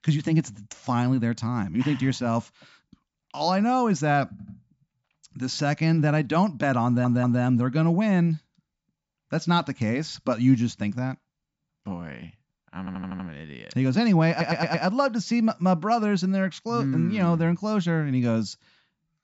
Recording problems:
high frequencies cut off; noticeable; nothing above 8 kHz
audio stuttering; 4 times, first at 4.5 s

